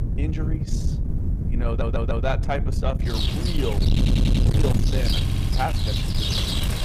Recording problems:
distortion; heavy; 8 dB below the speech
rain or running water; very loud; throughout; 1 dB above the speech
wind noise on the microphone; heavy; 6 dB below the speech
audio stuttering; at 1.5 s, at 4 s and at 5 s

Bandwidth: 15 kHz